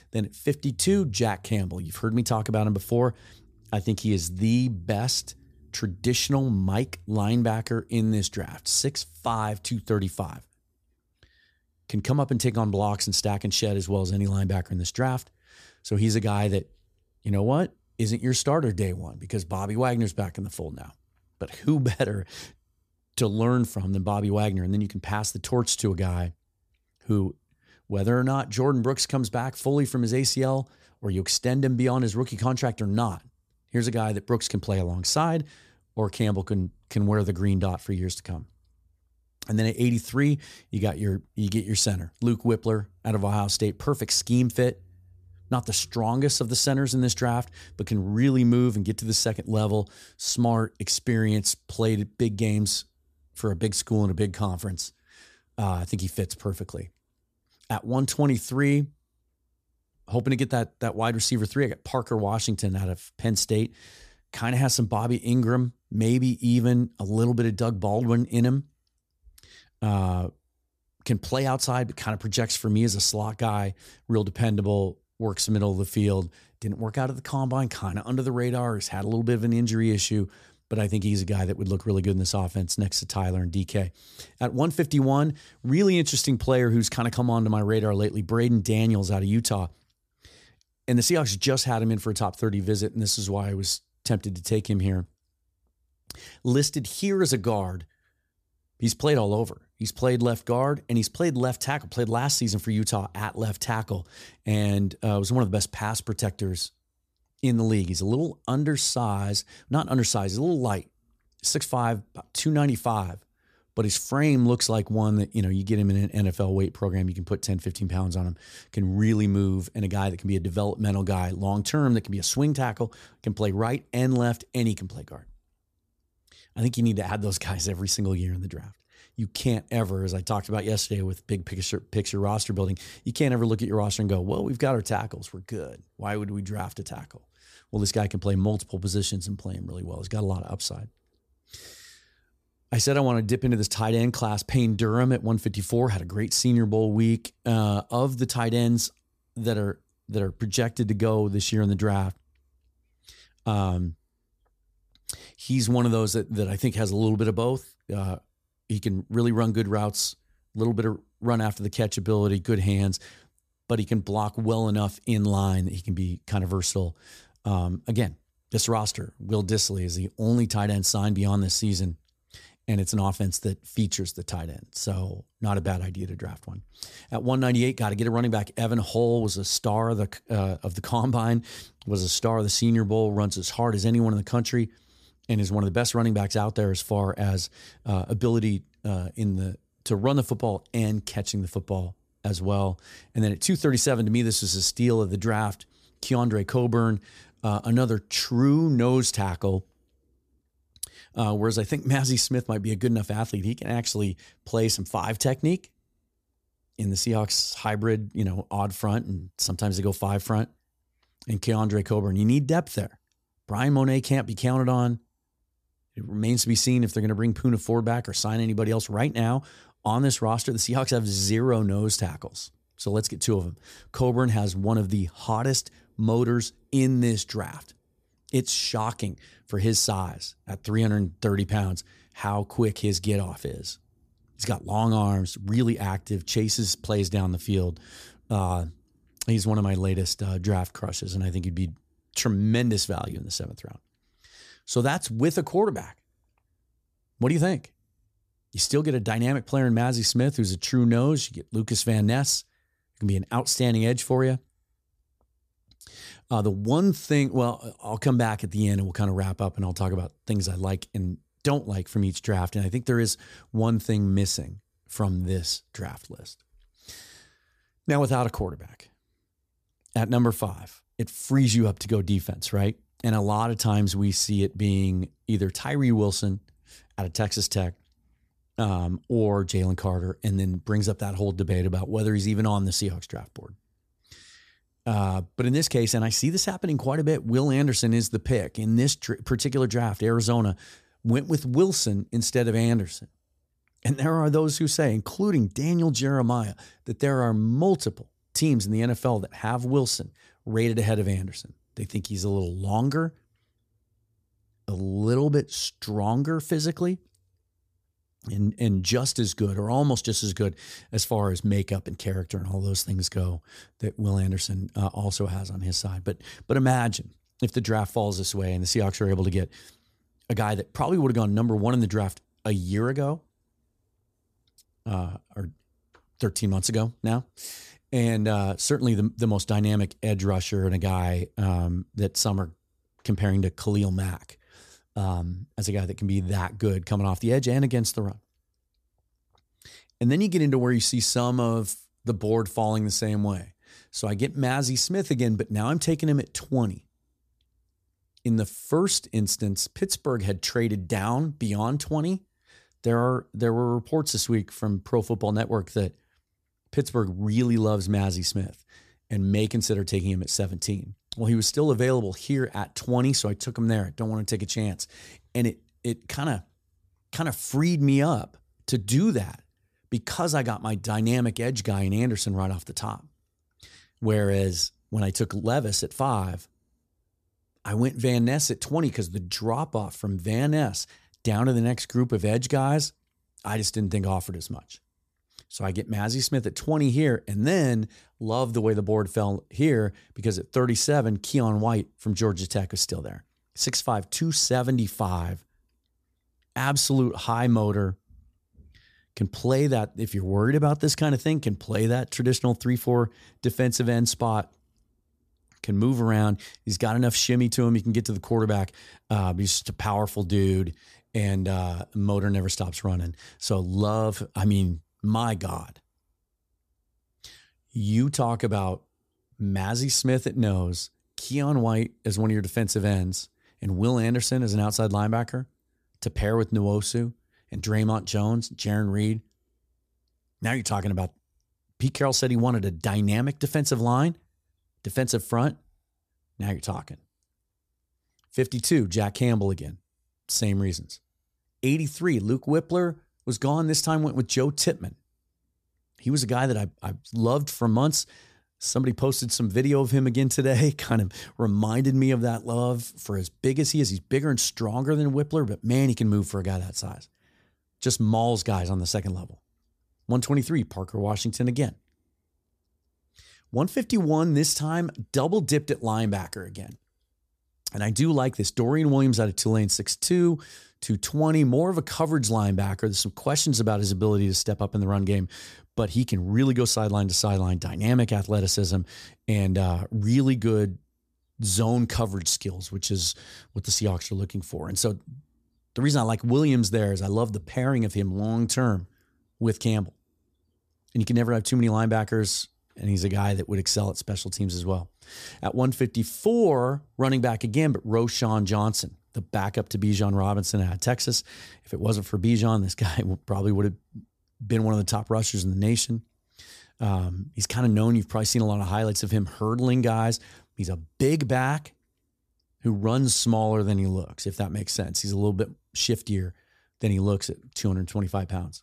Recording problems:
none

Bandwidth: 14.5 kHz